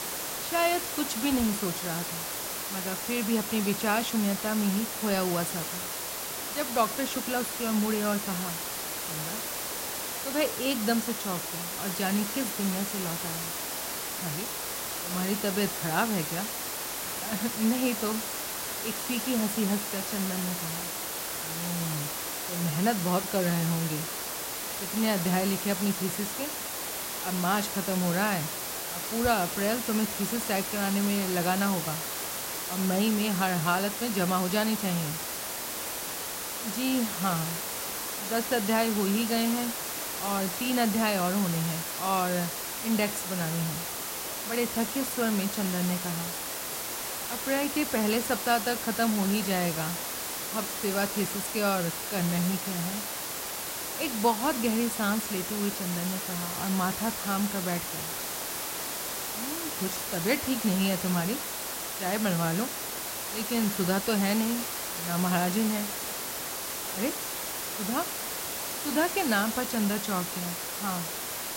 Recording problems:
hiss; loud; throughout; 2 dB below the speech

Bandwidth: 16 kHz